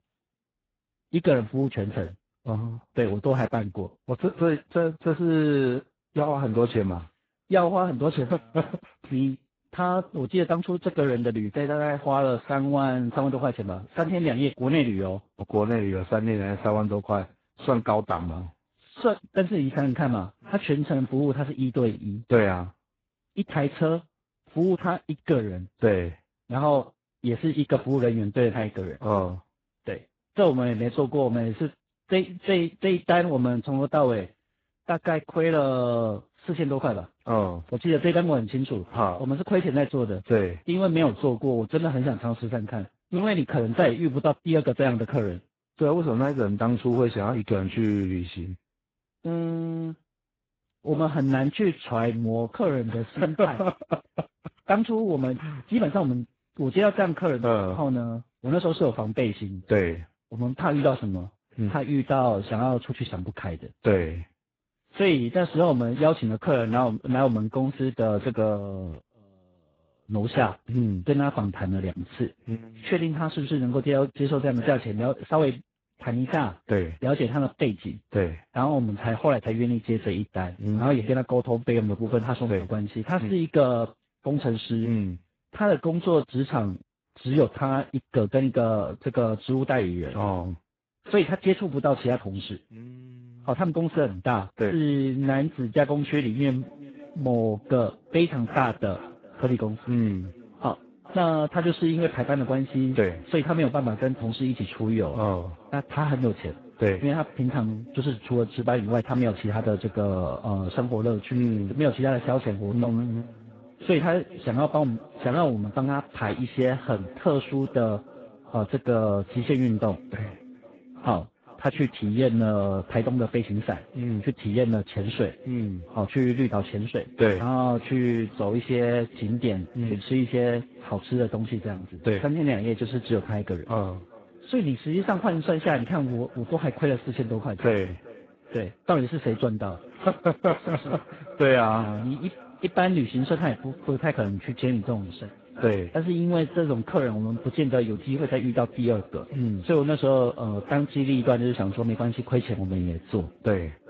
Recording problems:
garbled, watery; badly
echo of what is said; faint; from 1:37 on; 400 ms later, 20 dB below the speech

